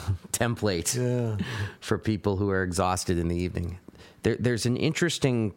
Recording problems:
squashed, flat; somewhat

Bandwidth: 16 kHz